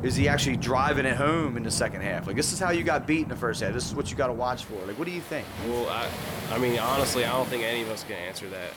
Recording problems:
rain or running water; loud; throughout; 7 dB below the speech

